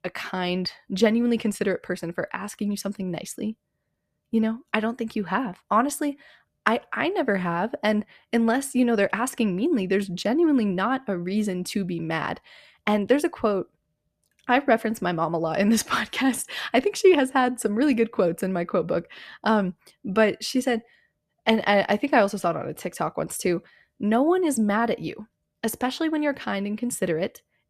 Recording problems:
none

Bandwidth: 14.5 kHz